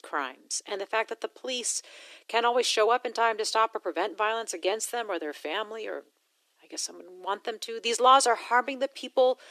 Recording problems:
thin; very; fading below 300 Hz

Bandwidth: 13.5 kHz